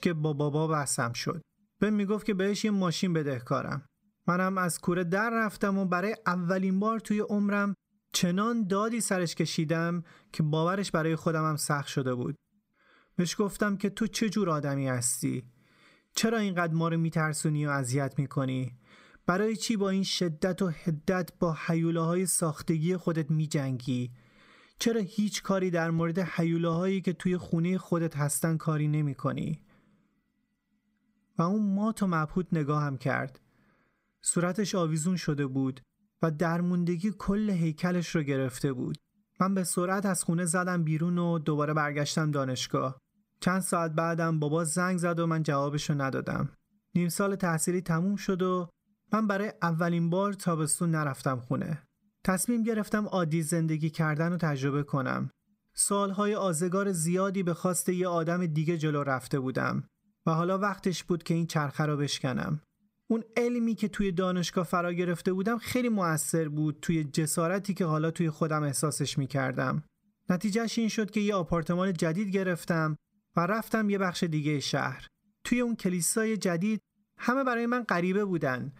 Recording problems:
squashed, flat; somewhat

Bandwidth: 15.5 kHz